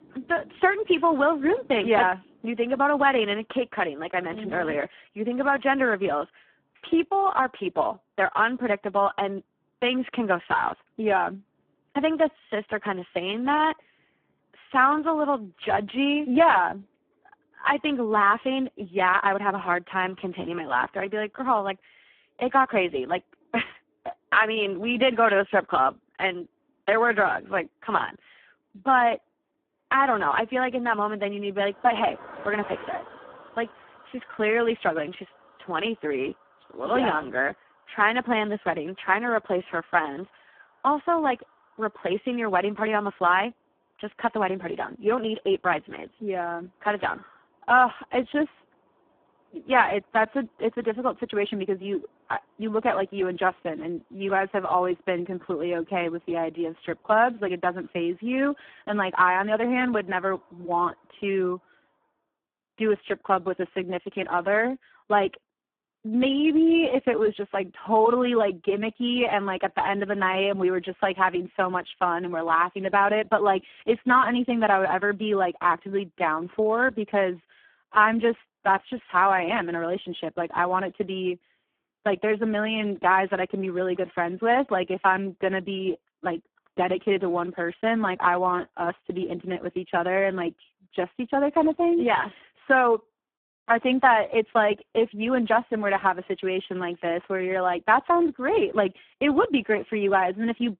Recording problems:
phone-call audio; poor line
traffic noise; faint; until 1:02; 25 dB below the speech

